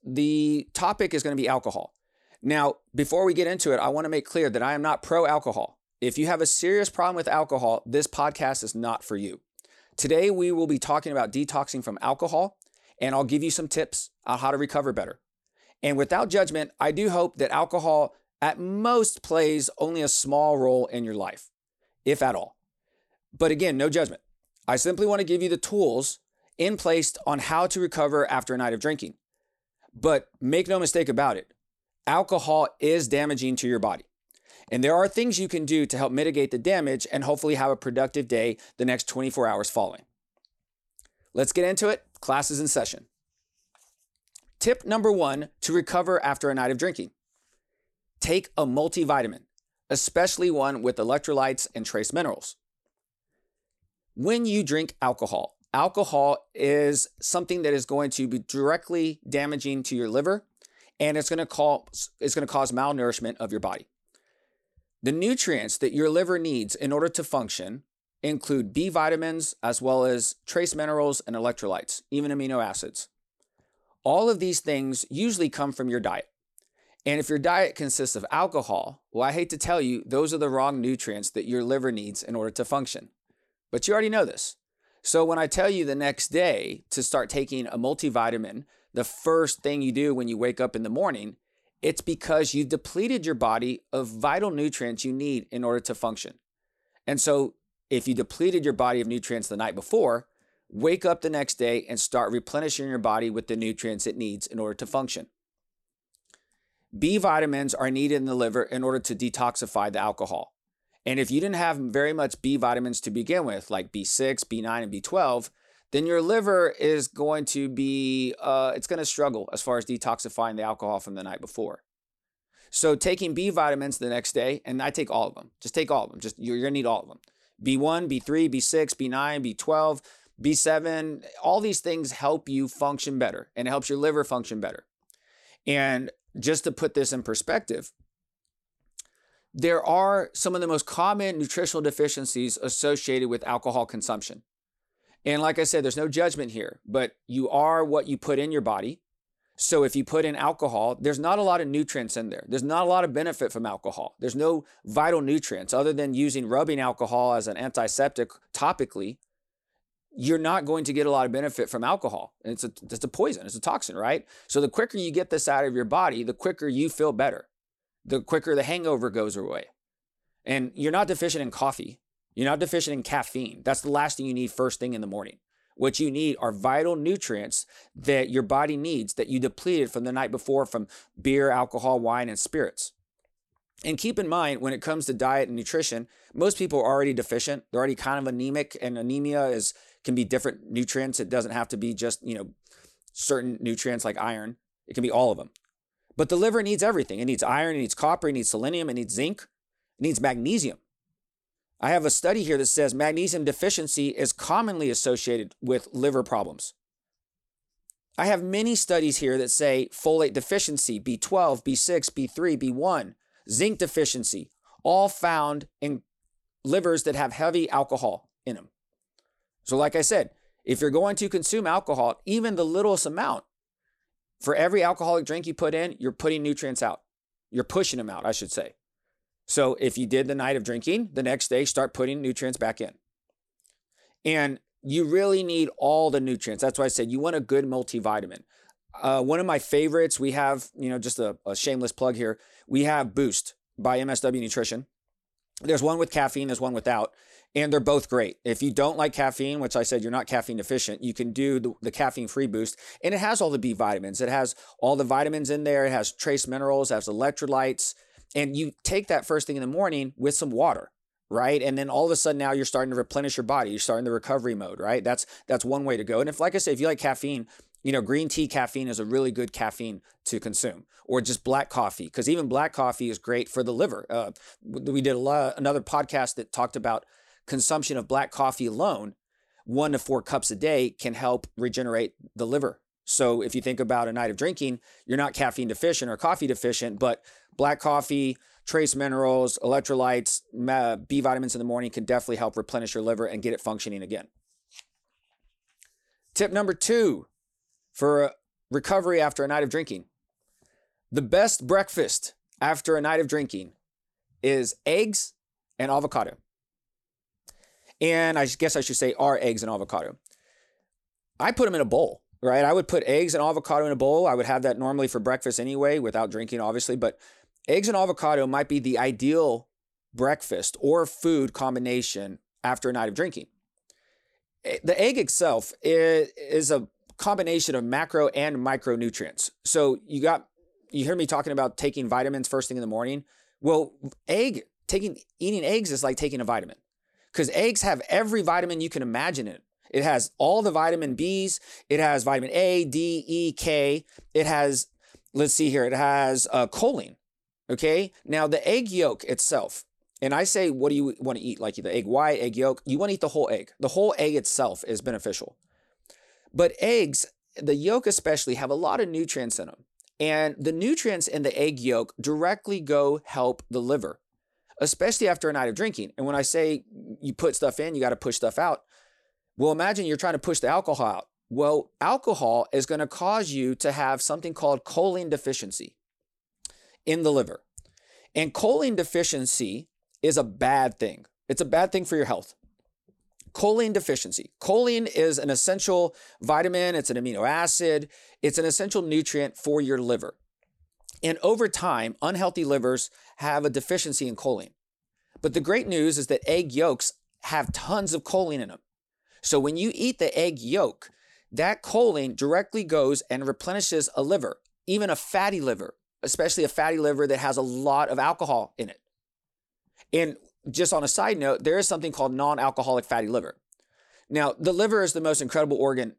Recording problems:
none

